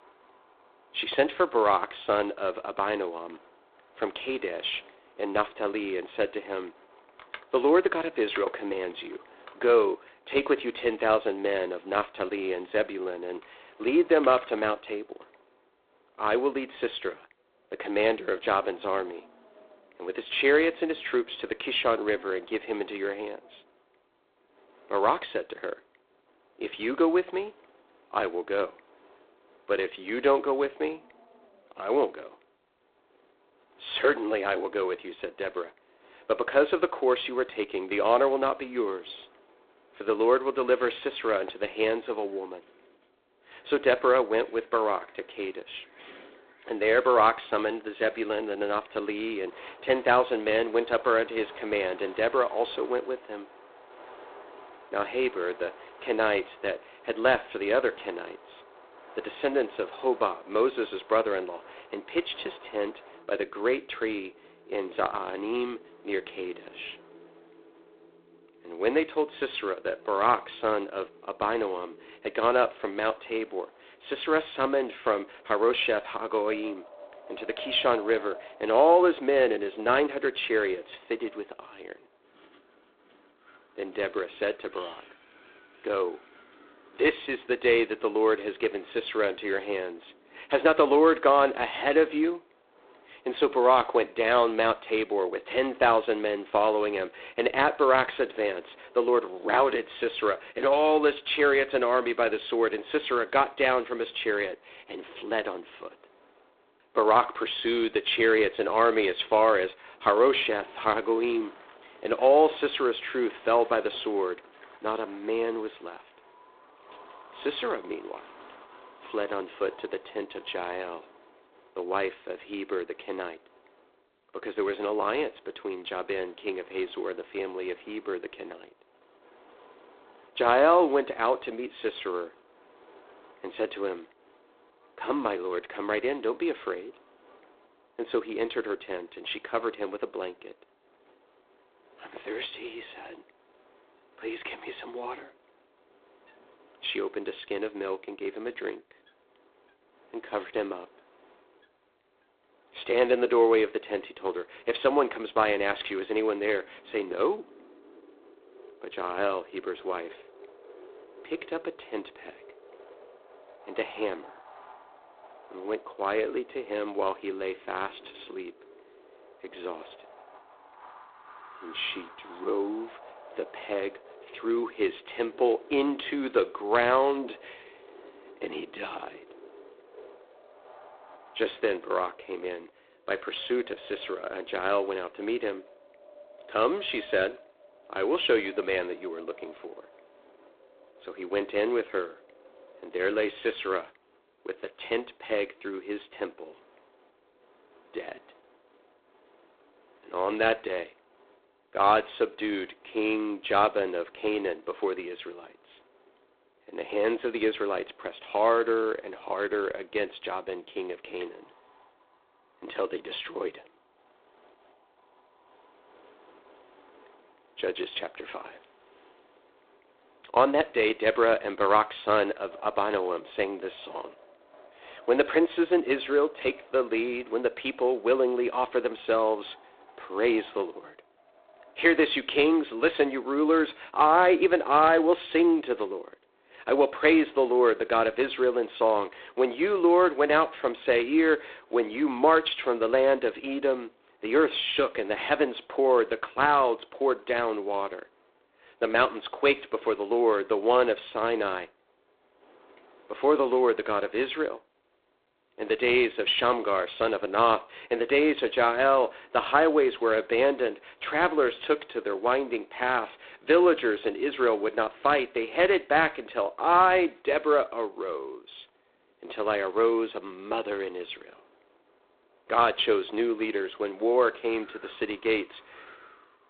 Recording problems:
phone-call audio; poor line; nothing above 3.5 kHz
wind in the background; faint; throughout; 25 dB below the speech

